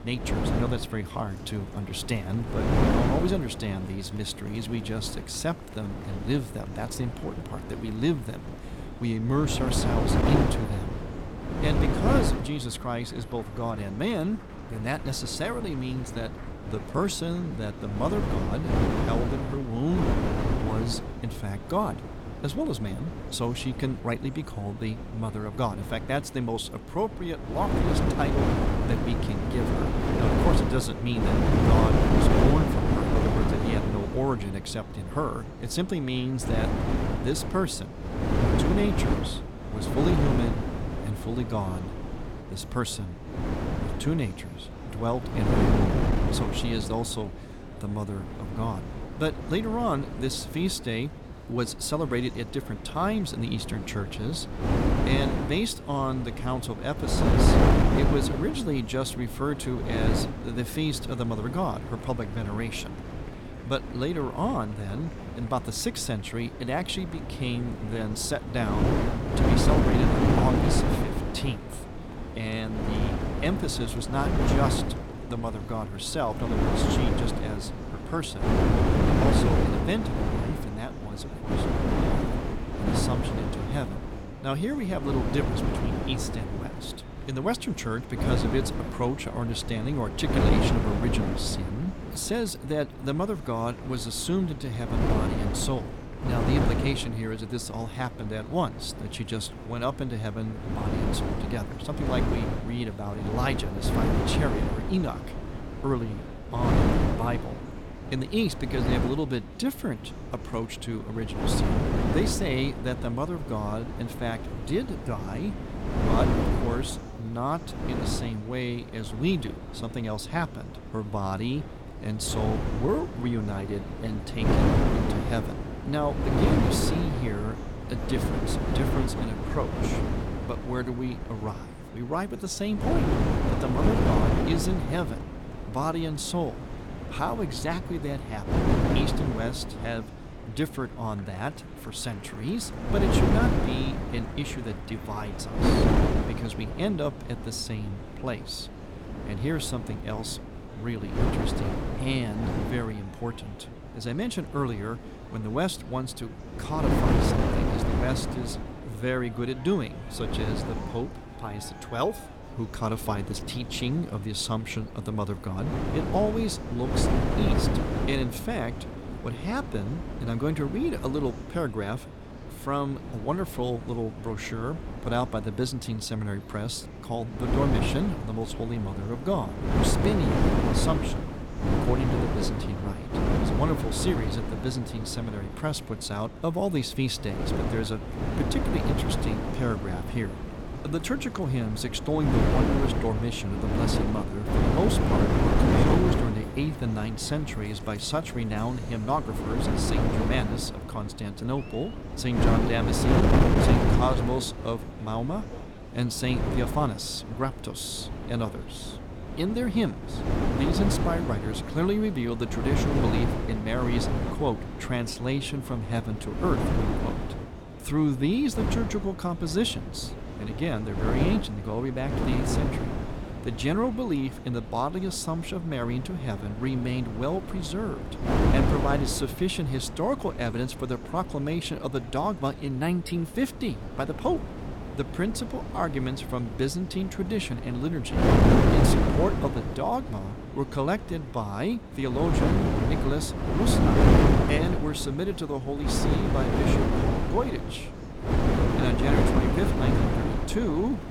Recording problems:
wind noise on the microphone; heavy; as loud as the speech
murmuring crowd; noticeable; throughout; 20 dB below the speech

